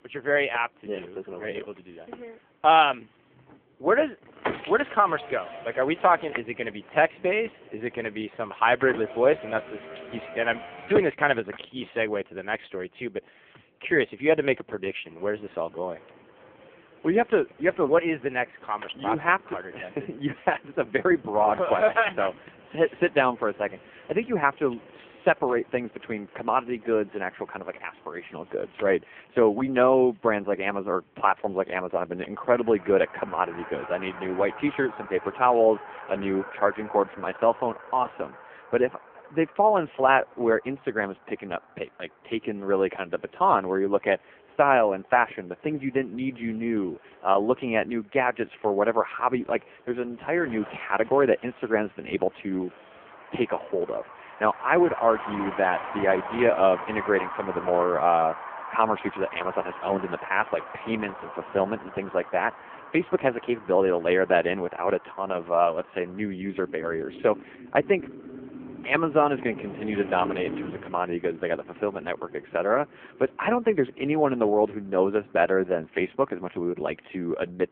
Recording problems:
phone-call audio; poor line
traffic noise; noticeable; throughout; 15 dB below the speech

